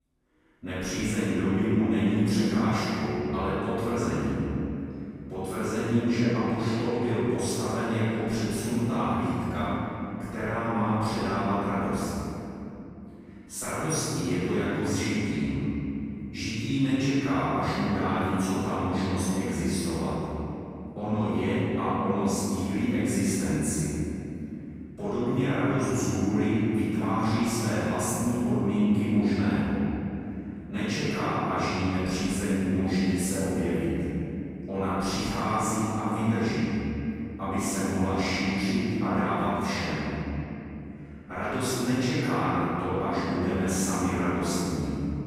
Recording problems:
room echo; strong; dies away in 3 s
off-mic speech; far

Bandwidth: 15.5 kHz